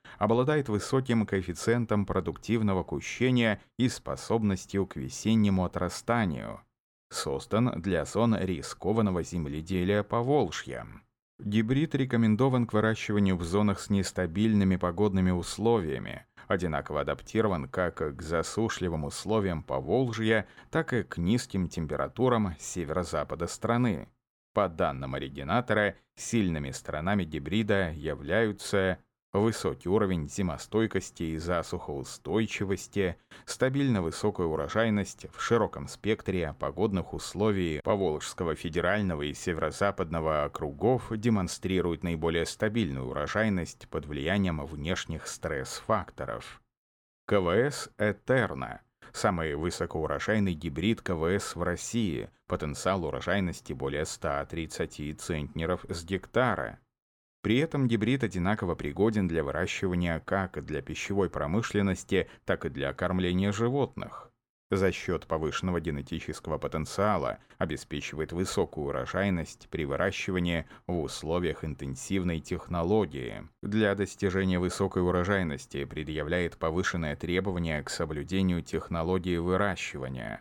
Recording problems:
none

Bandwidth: 17.5 kHz